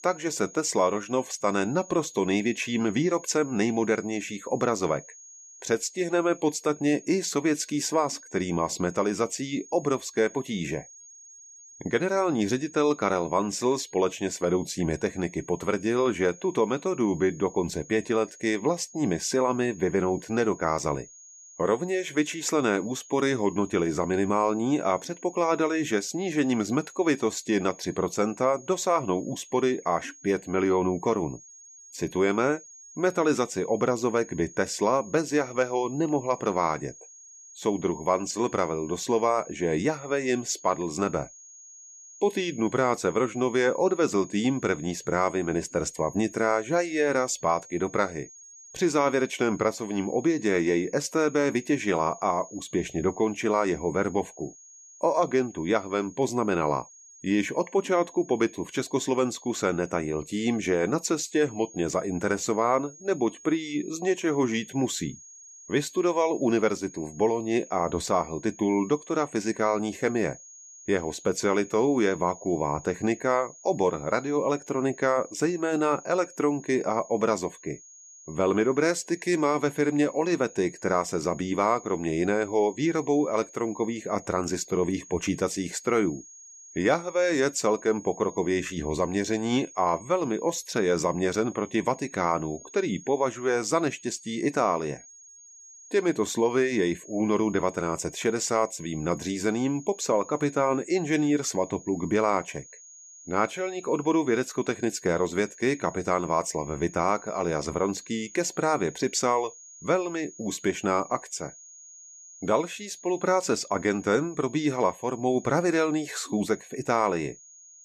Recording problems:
high-pitched whine; noticeable; throughout; 6.5 kHz, 20 dB below the speech

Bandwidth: 13.5 kHz